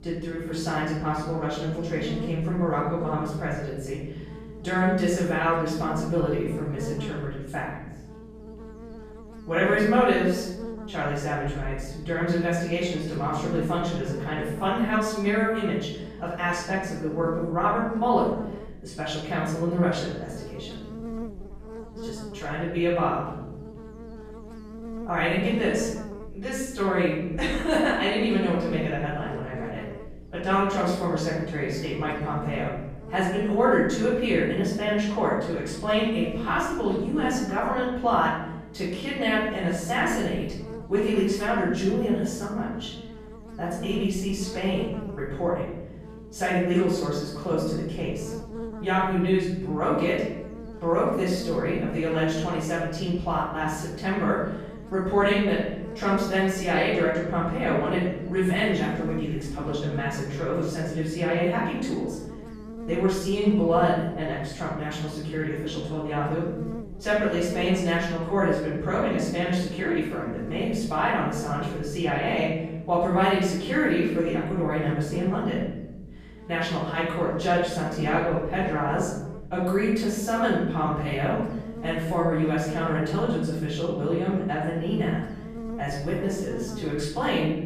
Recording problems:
off-mic speech; far
room echo; noticeable; dies away in 1 s
electrical hum; noticeable; throughout; 60 Hz, 15 dB below the speech

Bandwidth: 14.5 kHz